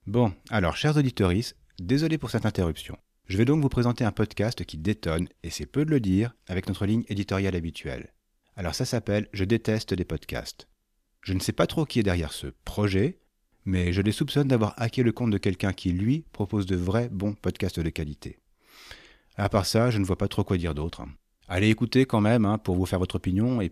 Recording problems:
none

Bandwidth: 14.5 kHz